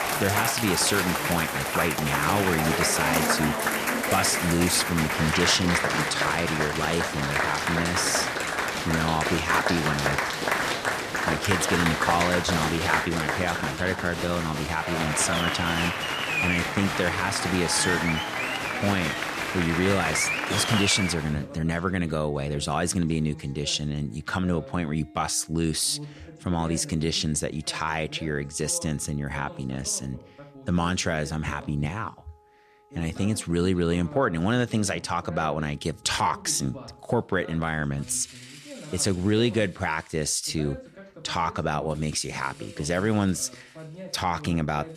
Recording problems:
crowd noise; very loud; until 21 s; as loud as the speech
voice in the background; noticeable; throughout; 15 dB below the speech
background music; faint; from 10 s on; 25 dB below the speech

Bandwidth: 14.5 kHz